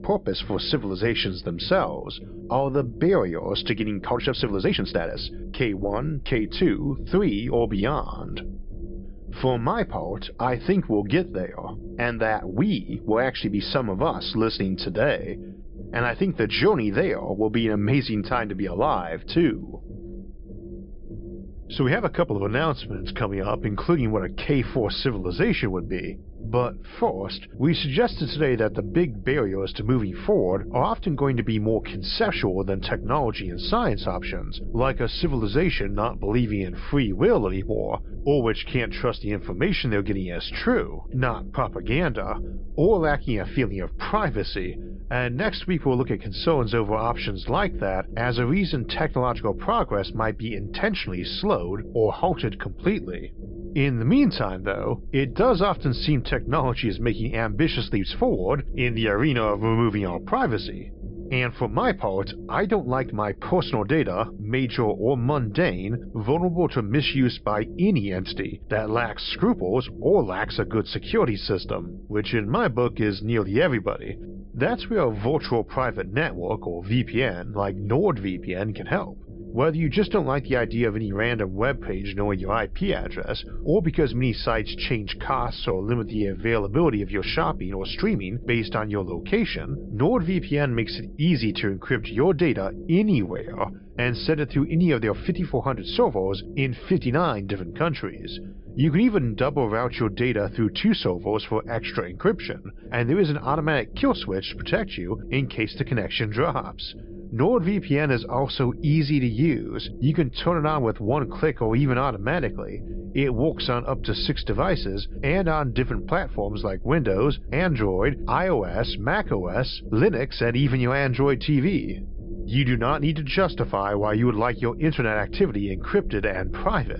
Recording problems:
high frequencies cut off; noticeable; nothing above 5.5 kHz
low rumble; noticeable; throughout; 20 dB below the speech
uneven, jittery; strongly; from 4 s to 1:34

